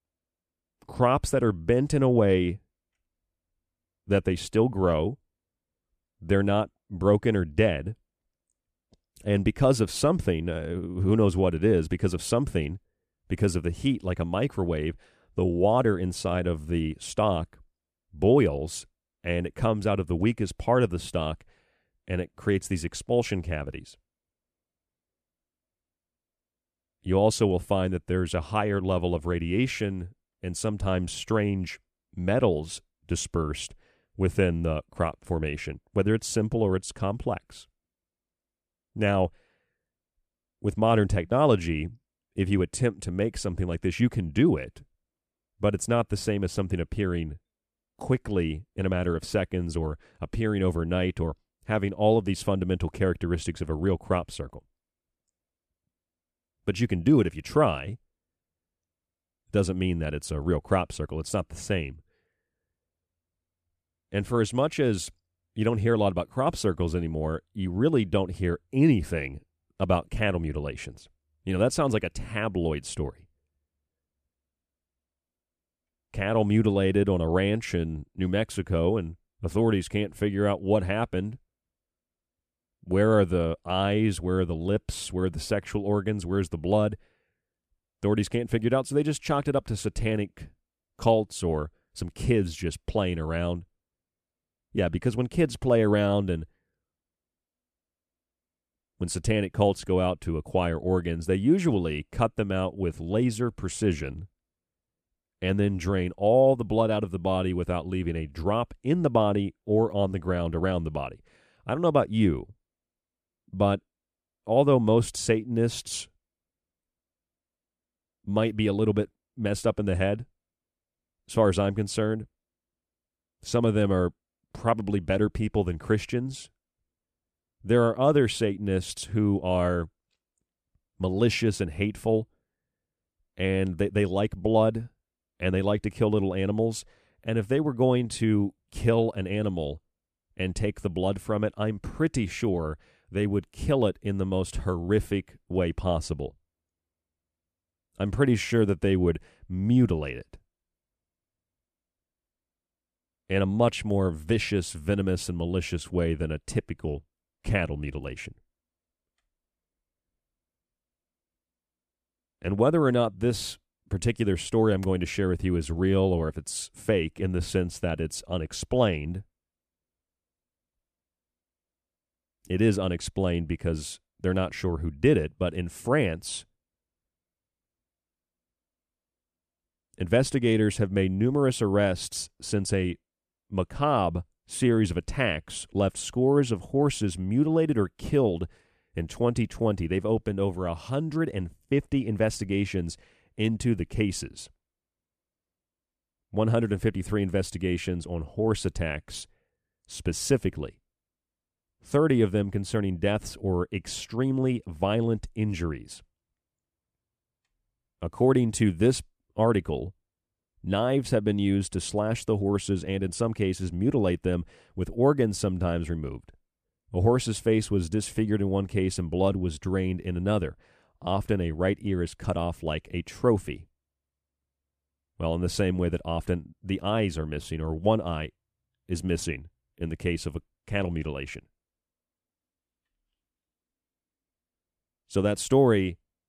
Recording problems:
none

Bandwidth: 14.5 kHz